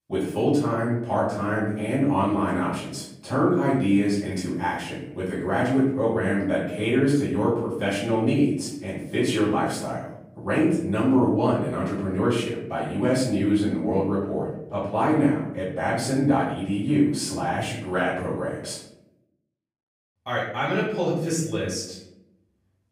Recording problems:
off-mic speech; far
room echo; noticeable; dies away in 0.8 s

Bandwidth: 15.5 kHz